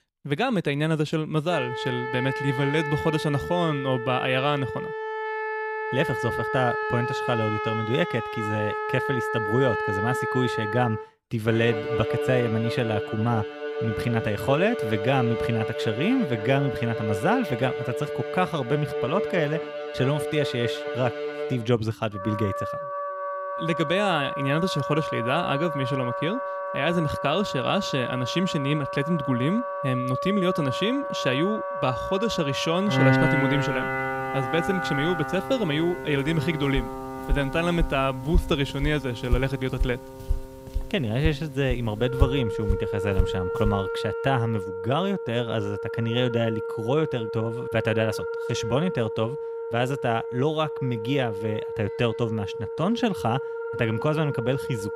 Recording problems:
background music; loud; throughout; 4 dB below the speech
footsteps; noticeable; from 37 to 44 s; peak 2 dB below the speech

